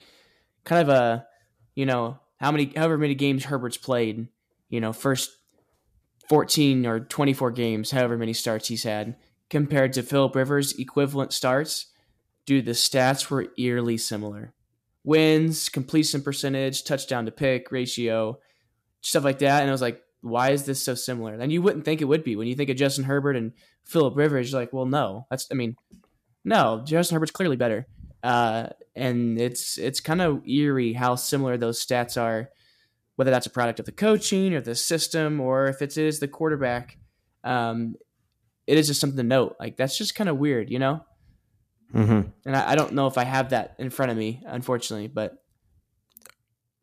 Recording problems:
uneven, jittery; strongly; from 2 to 43 s

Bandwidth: 14.5 kHz